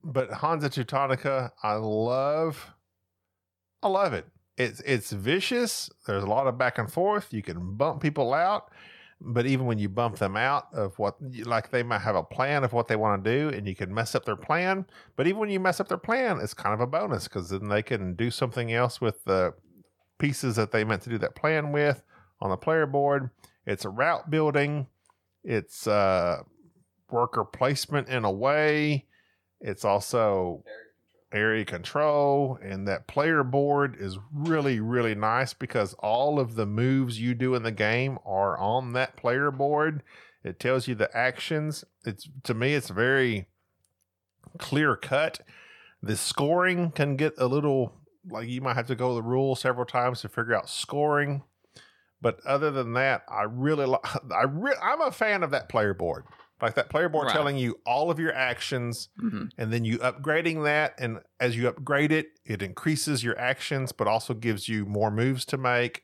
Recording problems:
none

